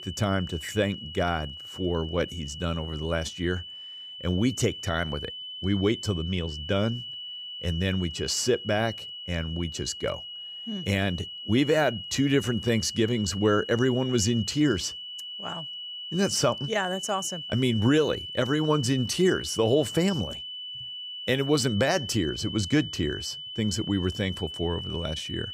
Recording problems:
high-pitched whine; loud; throughout; 3 kHz, 9 dB below the speech

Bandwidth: 15 kHz